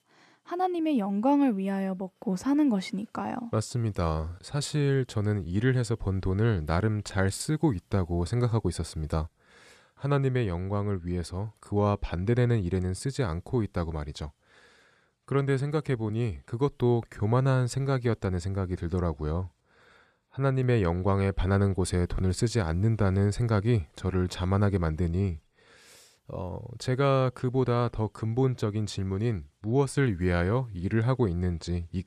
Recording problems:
none

